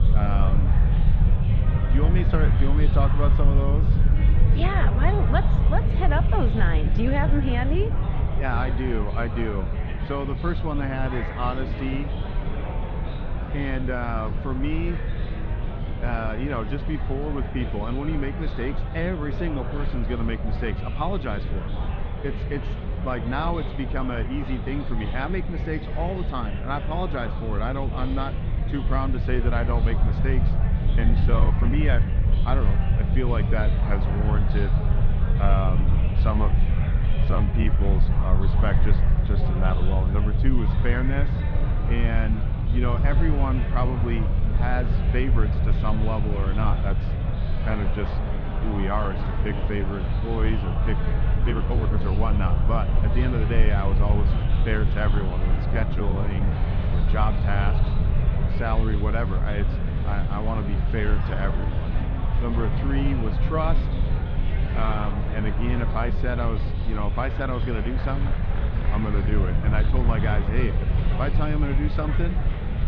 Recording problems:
muffled; very; fading above 3.5 kHz
murmuring crowd; loud; throughout; 6 dB below the speech
low rumble; loud; throughout; 10 dB below the speech
rain or running water; faint; throughout; 25 dB below the speech
uneven, jittery; strongly; from 31 to 57 s

